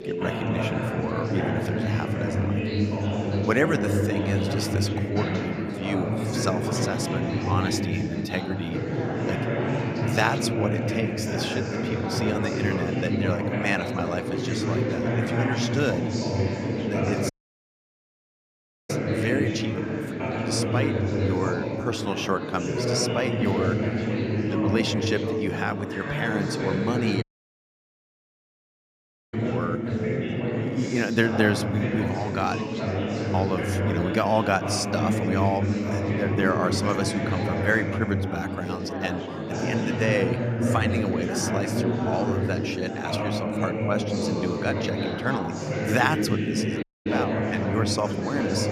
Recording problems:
chatter from many people; very loud; throughout; 2 dB above the speech
audio cutting out; at 17 s for 1.5 s, at 27 s for 2 s and at 47 s

